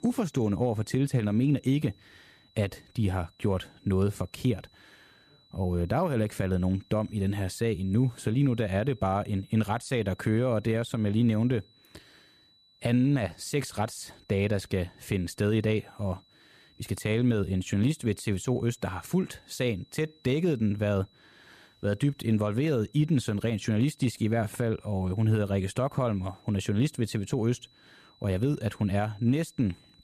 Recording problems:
high-pitched whine; faint; throughout; 4 kHz, 30 dB below the speech

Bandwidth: 14.5 kHz